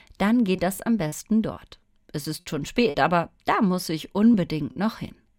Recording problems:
choppy; occasionally; 5% of the speech affected

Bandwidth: 16.5 kHz